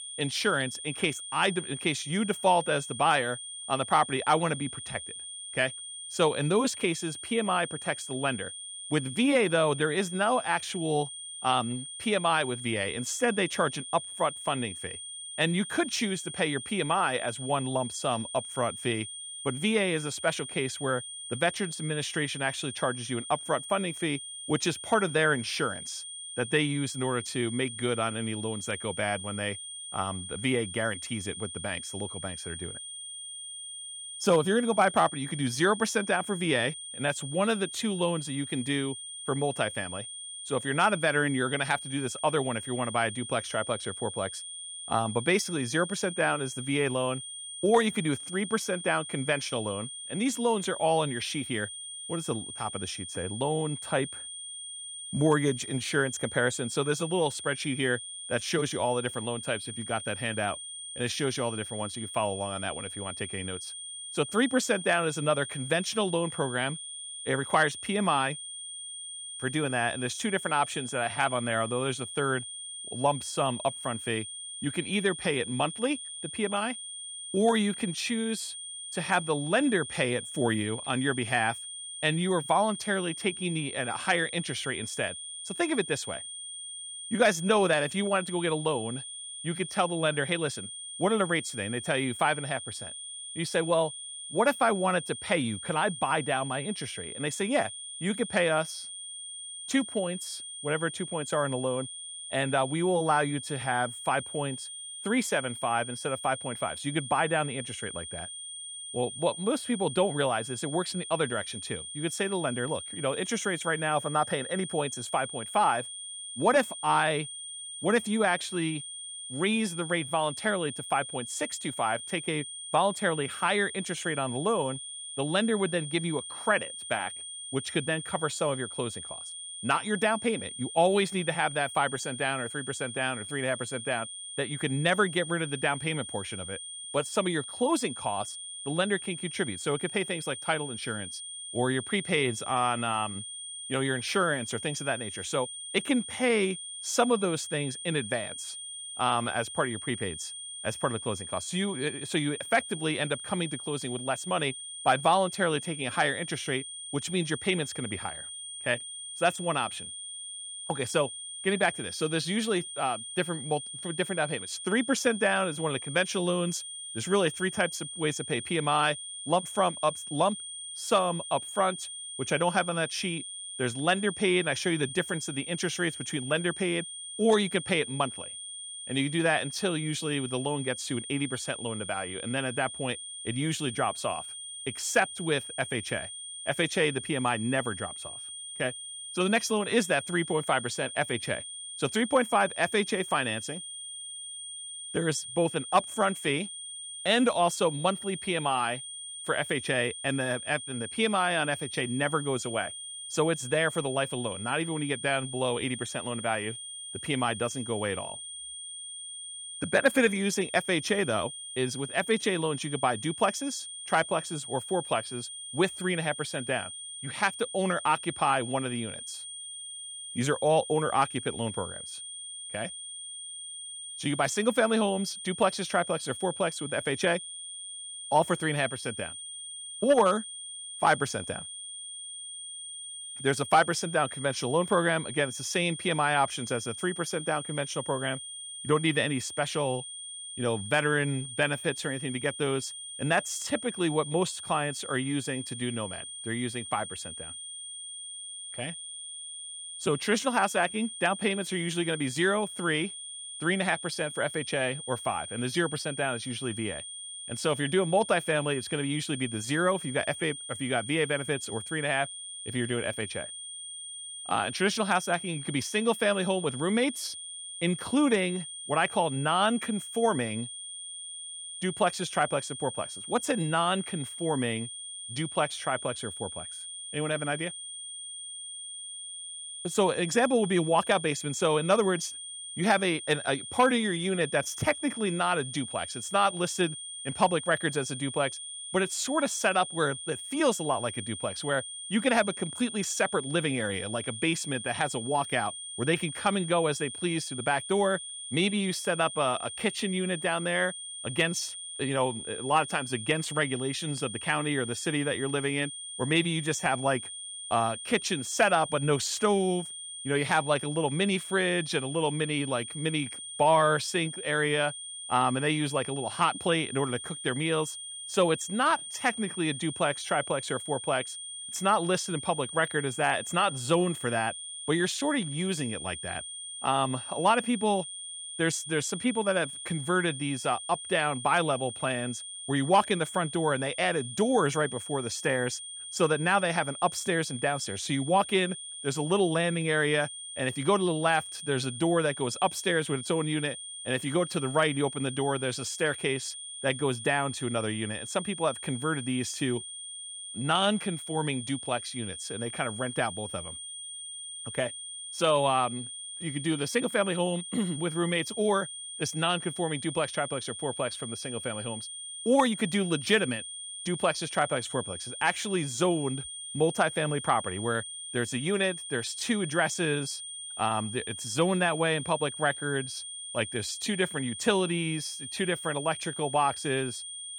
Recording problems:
high-pitched whine; loud; throughout; 3.5 kHz, 9 dB below the speech

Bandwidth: 18 kHz